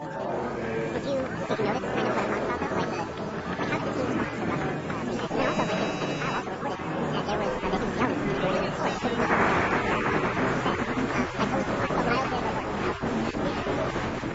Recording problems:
garbled, watery; badly; nothing above 7.5 kHz
wrong speed and pitch; too fast and too high; 1.7 times normal speed
muffled; very slightly; fading above 2.5 kHz
murmuring crowd; very loud; throughout; 5 dB above the speech
electrical hum; noticeable; throughout; 60 Hz, 15 dB below the speech
phone ringing; noticeable; until 4.5 s; peak 7 dB below the speech
doorbell; noticeable; from 5.5 to 6.5 s; peak 6 dB below the speech

